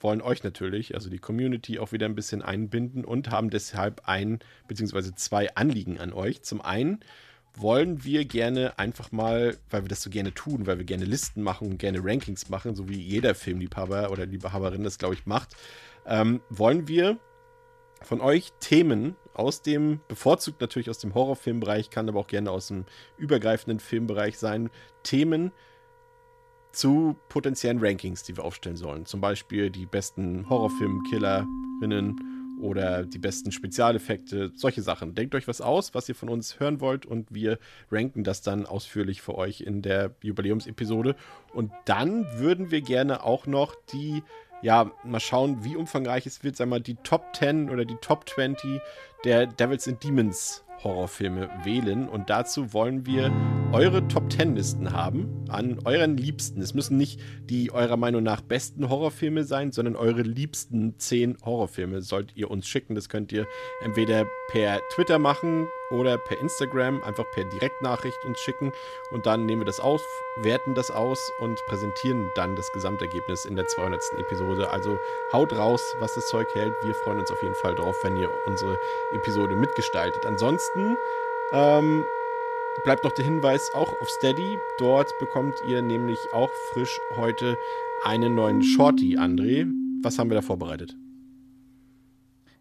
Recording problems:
background music; loud; throughout; 4 dB below the speech

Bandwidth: 14.5 kHz